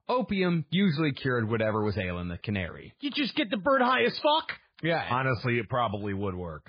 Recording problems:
garbled, watery; badly

